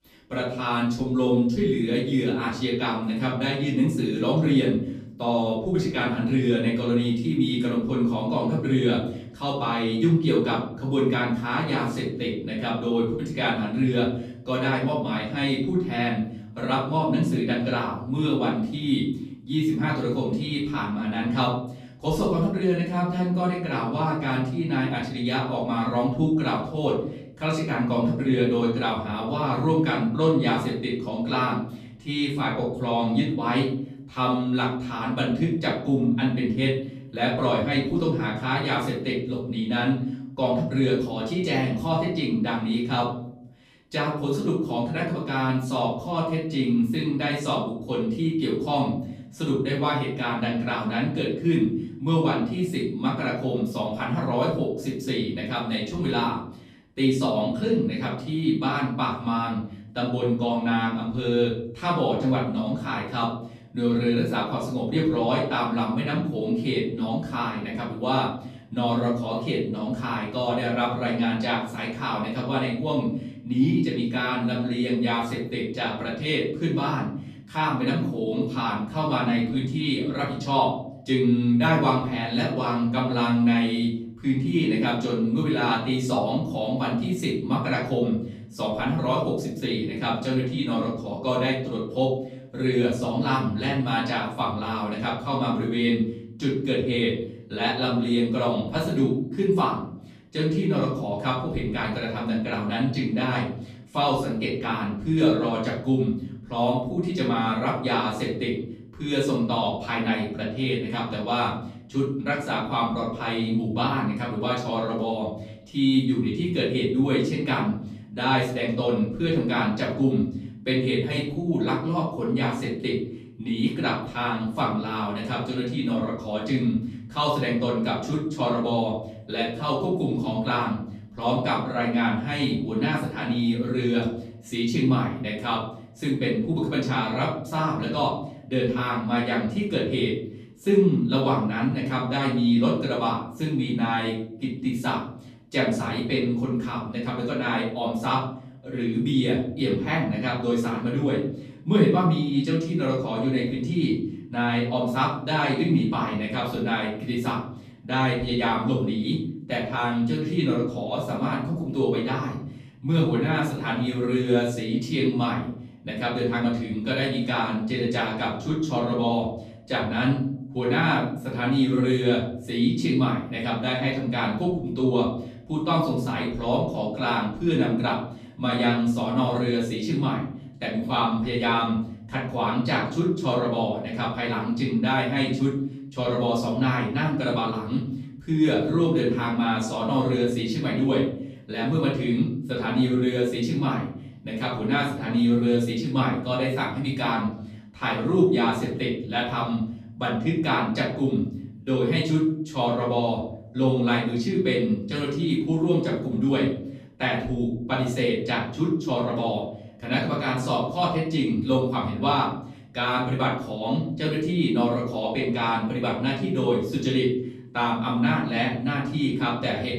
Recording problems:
off-mic speech; far
room echo; noticeable; dies away in 0.7 s

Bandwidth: 14.5 kHz